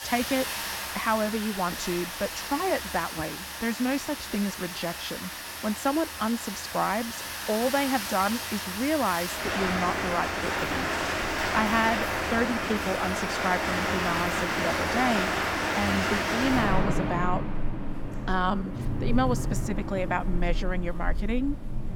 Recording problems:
rain or running water; loud; throughout; 1 dB below the speech

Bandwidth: 17 kHz